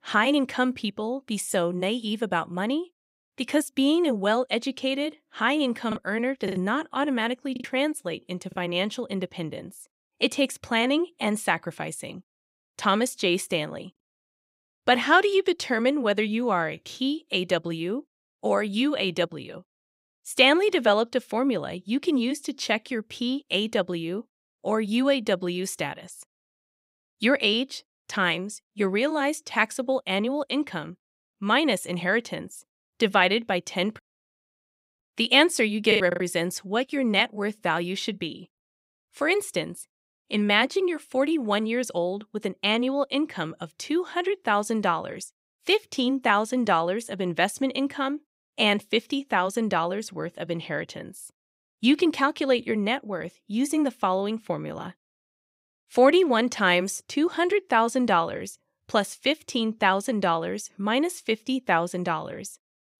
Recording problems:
choppy; very; from 6 to 7.5 s and at 36 s; 6% of the speech affected

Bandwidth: 15.5 kHz